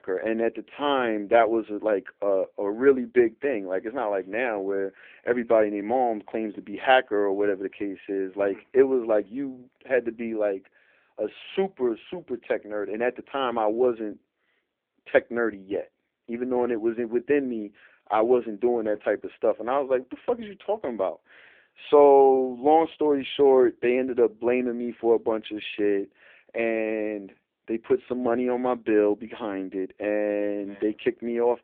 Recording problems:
phone-call audio; poor line; nothing above 3.5 kHz

